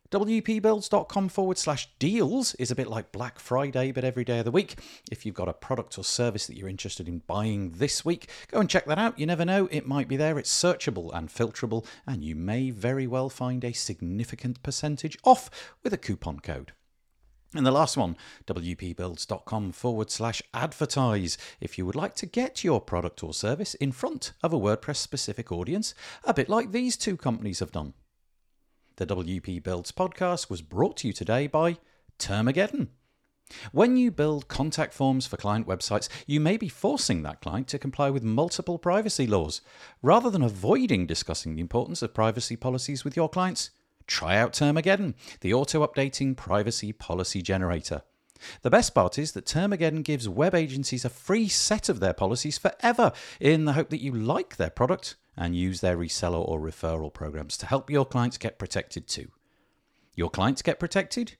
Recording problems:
none

